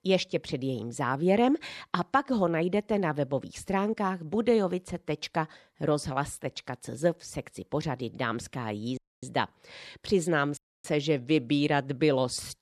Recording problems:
audio cutting out; at 9 s and at 11 s

